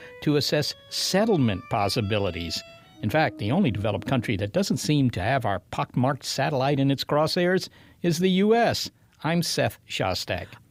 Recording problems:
background music; faint; until 4.5 s; 20 dB below the speech

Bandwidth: 15.5 kHz